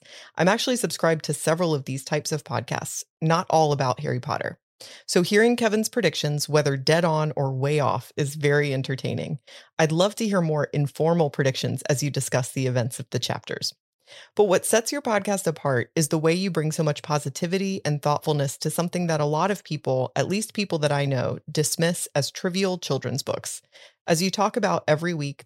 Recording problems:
none

